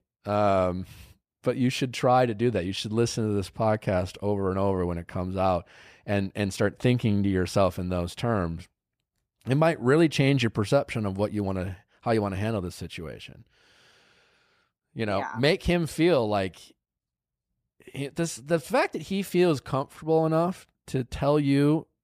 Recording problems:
none

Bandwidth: 15 kHz